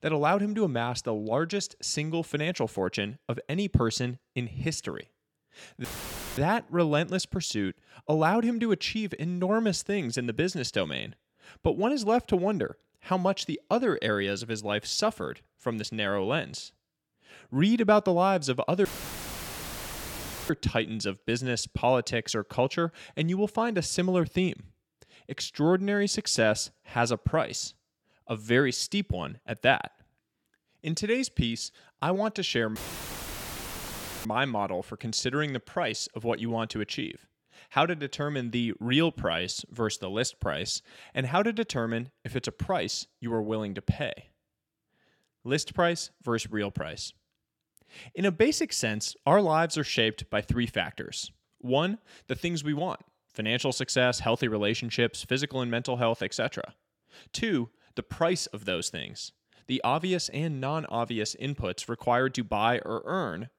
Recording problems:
audio cutting out; filled with static; at 6 s for 0.5 s, at 19 s for 1.5 s and at 33 s for 1.5 s

